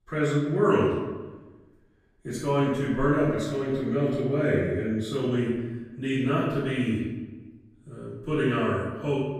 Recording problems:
room echo; strong; dies away in 1.1 s
off-mic speech; far

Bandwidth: 15 kHz